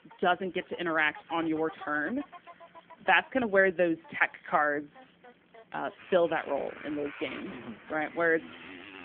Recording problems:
phone-call audio
traffic noise; noticeable; throughout; 20 dB below the speech

